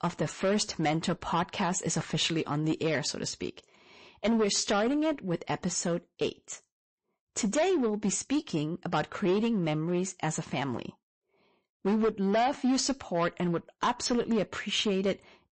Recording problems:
distortion; slight; 8% of the sound clipped
garbled, watery; slightly; nothing above 8 kHz

